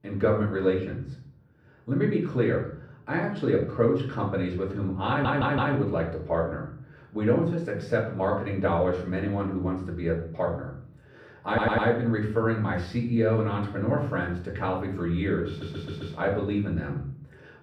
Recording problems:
off-mic speech; far
muffled; very; fading above 3.5 kHz
room echo; slight; dies away in 0.5 s
audio stuttering; at 5 s, at 11 s and at 15 s

